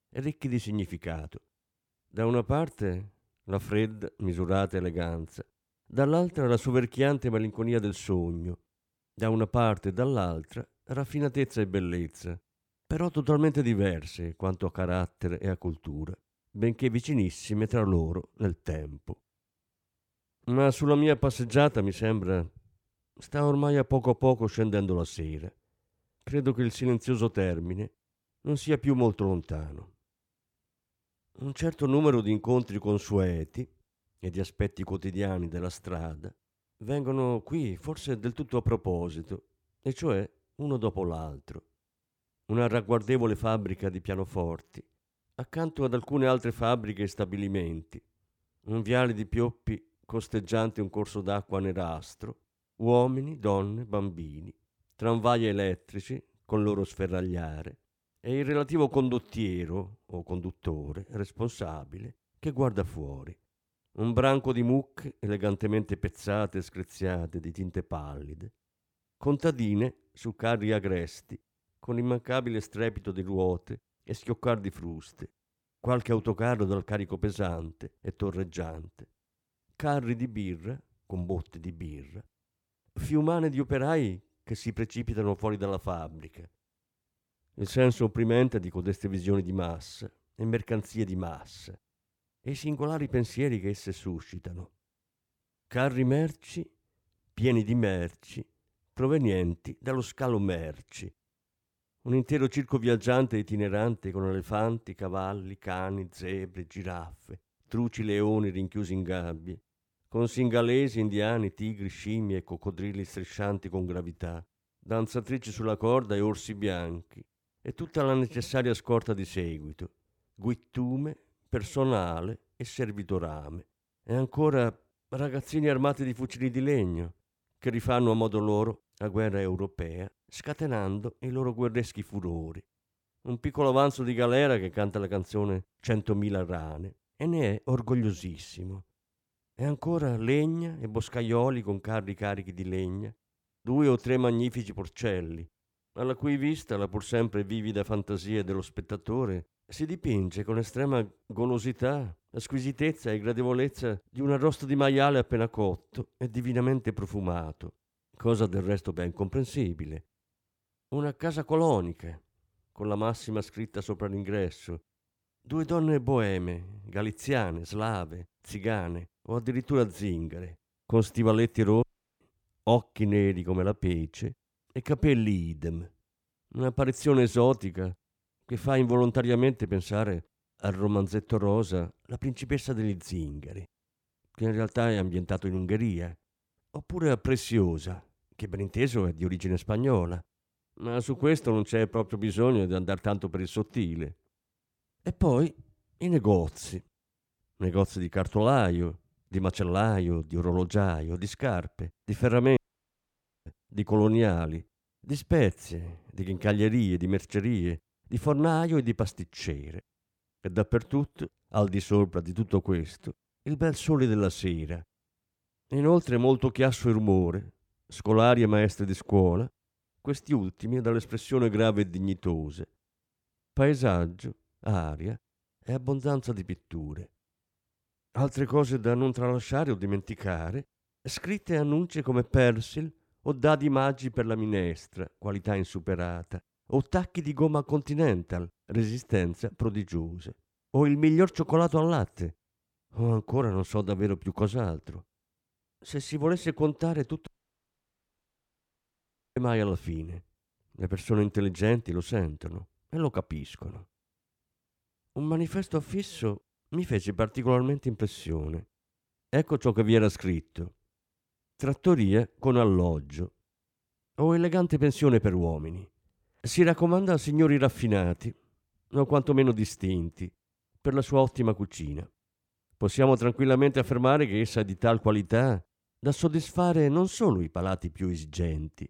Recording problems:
audio cutting out; at 2:52, at 3:23 for 1 s and at 4:07 for 2 s

